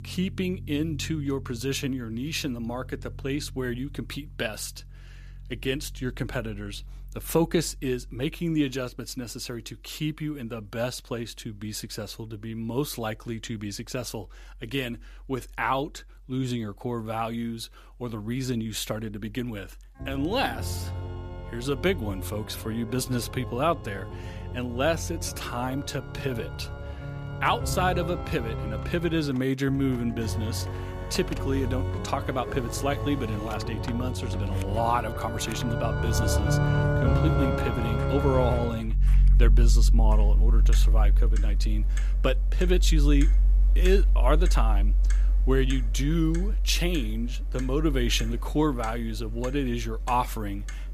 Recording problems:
background music; very loud; throughout; 2 dB above the speech
household noises; noticeable; from 28 s on; 20 dB below the speech

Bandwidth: 14.5 kHz